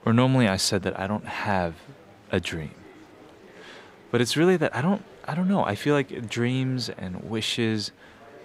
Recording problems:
murmuring crowd; faint; throughout; 25 dB below the speech

